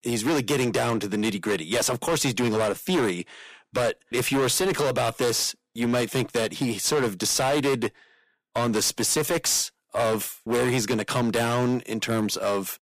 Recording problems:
distortion; heavy; 16% of the sound clipped

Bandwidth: 15 kHz